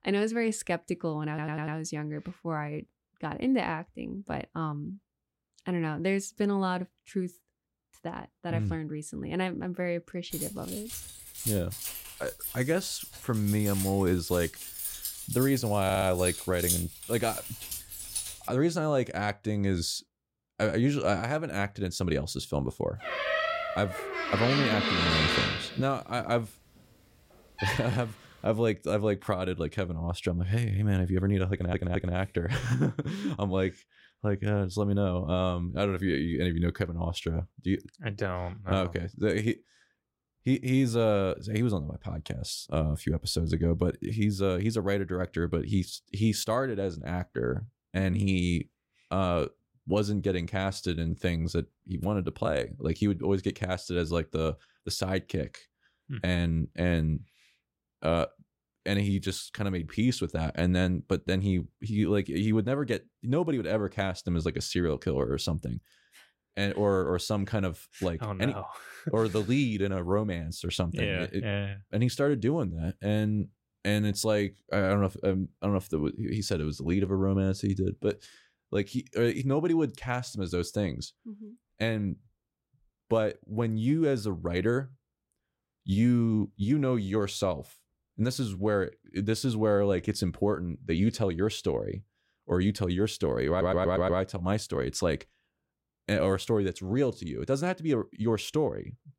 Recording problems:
audio stuttering; 4 times, first at 1.5 s
jangling keys; loud; from 10 to 18 s; peak 1 dB above the speech
door banging; loud; from 23 to 28 s; peak 5 dB above the speech

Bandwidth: 16 kHz